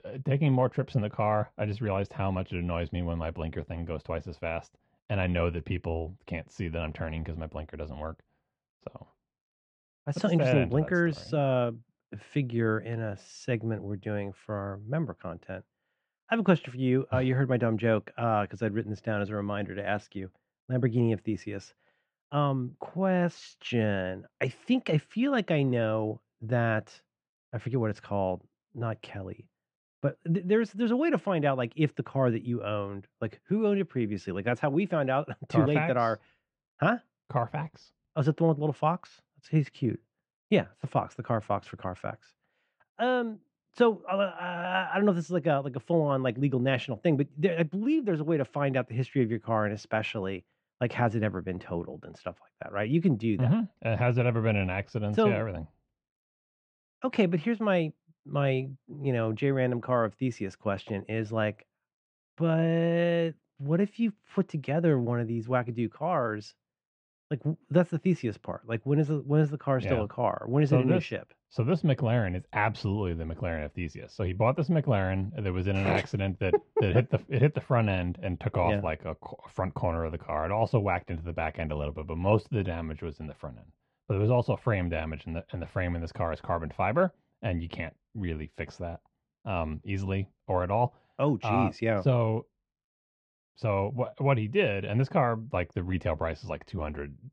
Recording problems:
muffled; slightly; fading above 3 kHz

